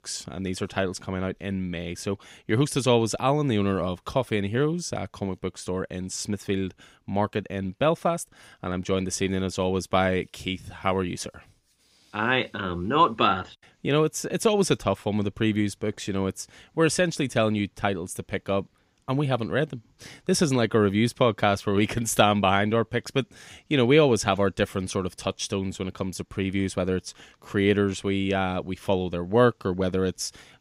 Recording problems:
none

